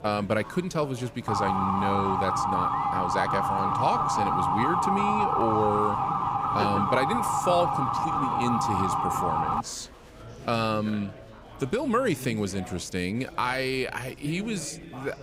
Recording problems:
chatter from many people; noticeable; throughout; 15 dB below the speech
siren; loud; from 1.5 to 9.5 s; peak 5 dB above the speech

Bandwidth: 15.5 kHz